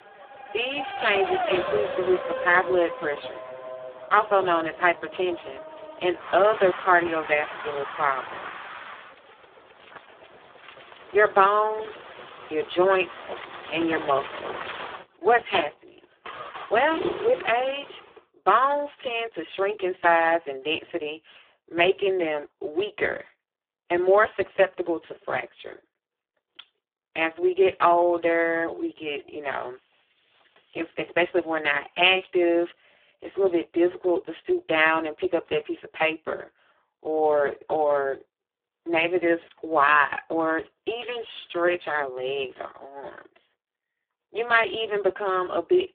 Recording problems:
phone-call audio; poor line
traffic noise; noticeable; until 18 s; 10 dB below the speech

